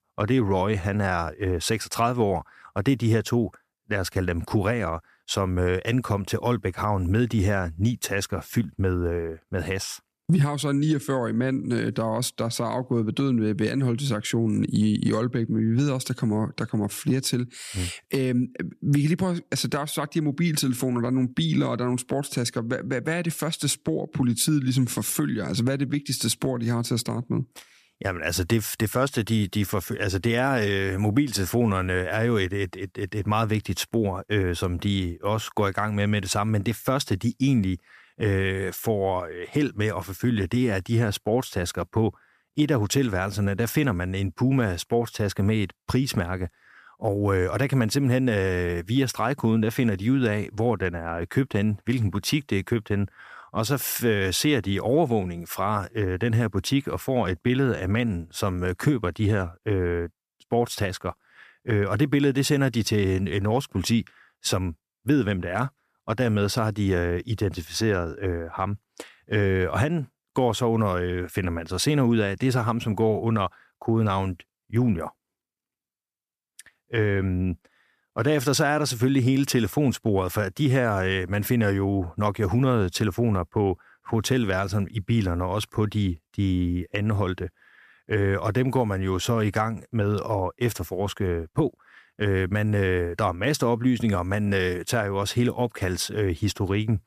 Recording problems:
none

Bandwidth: 14.5 kHz